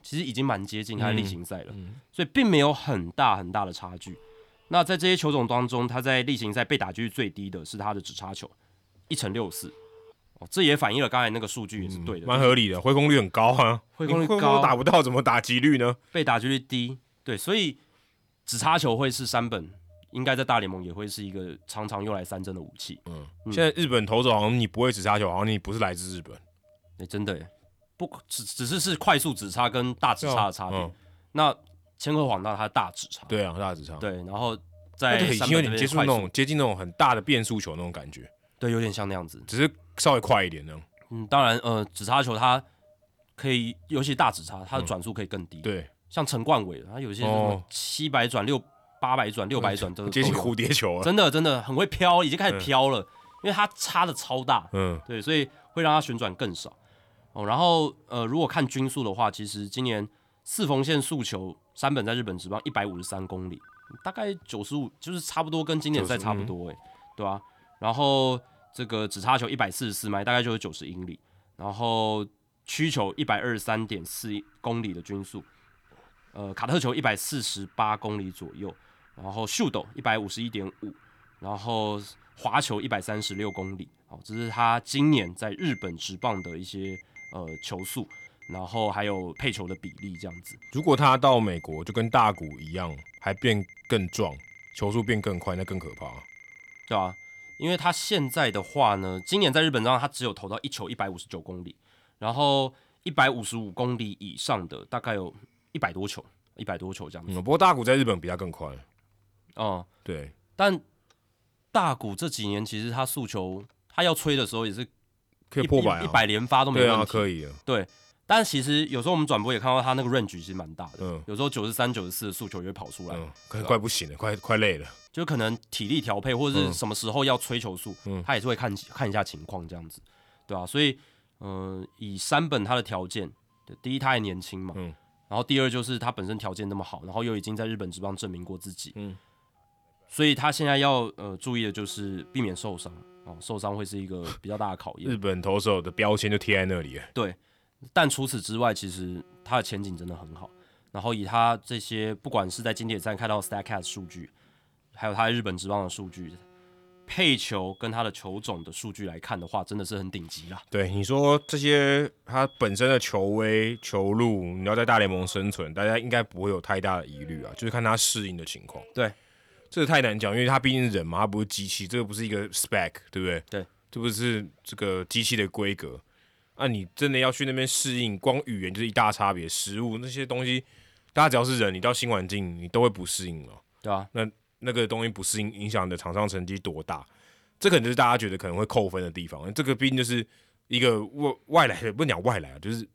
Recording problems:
alarms or sirens; faint; throughout; 25 dB below the speech

